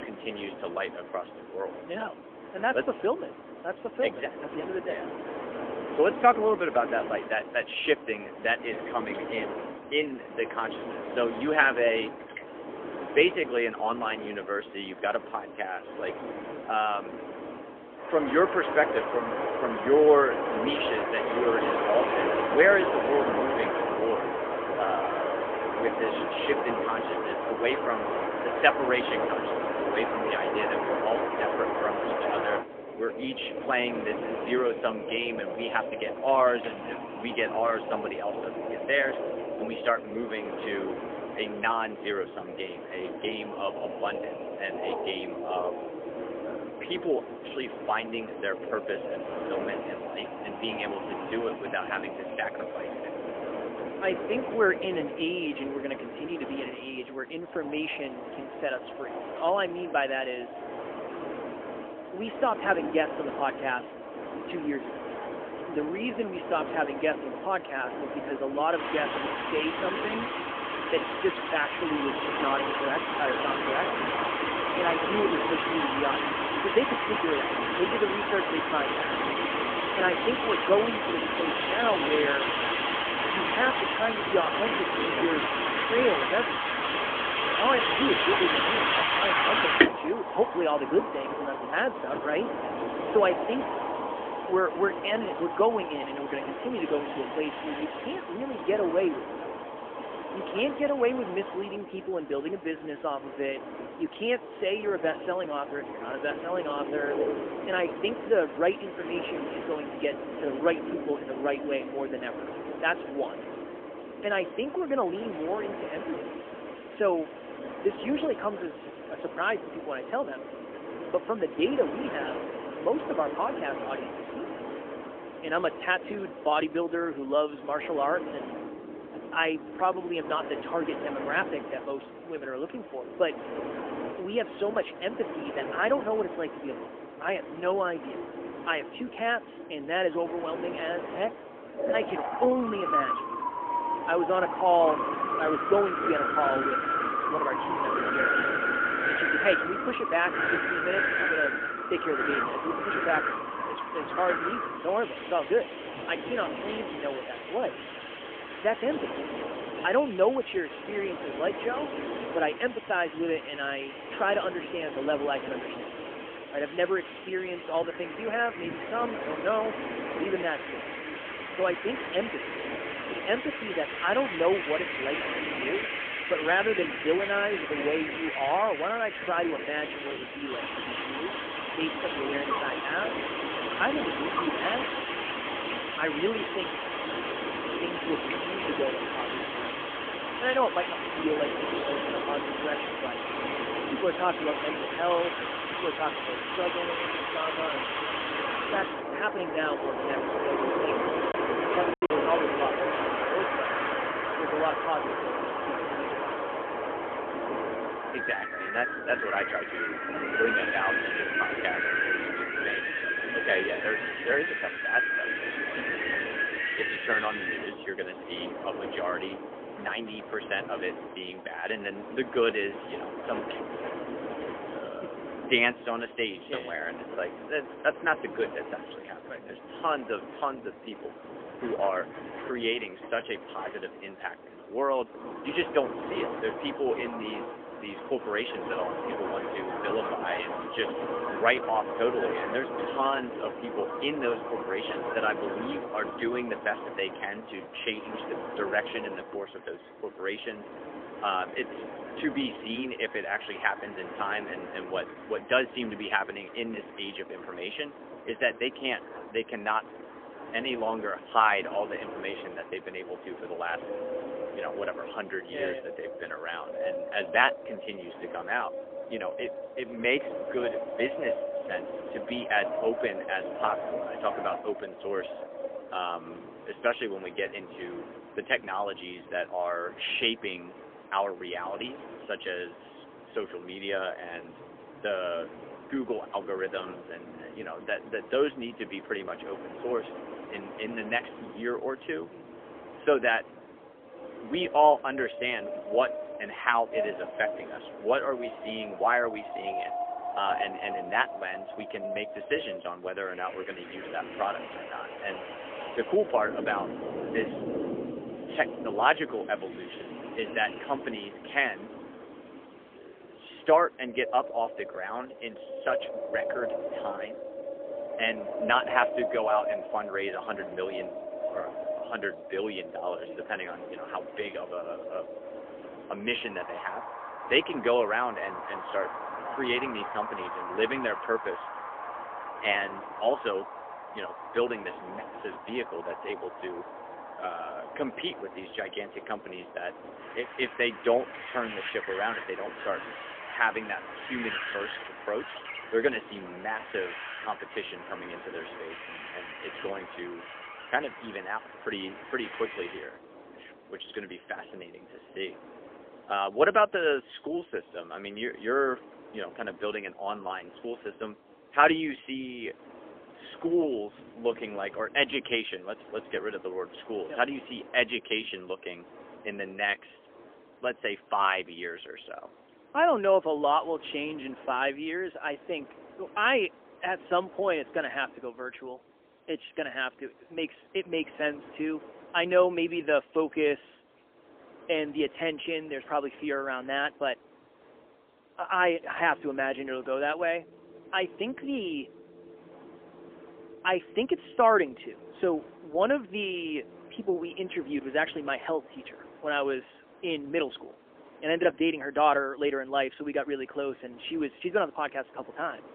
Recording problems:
phone-call audio; poor line; nothing above 3.5 kHz
wind in the background; loud; throughout; 2 dB below the speech
choppy; occasionally; at 3:22; 2% of the speech affected

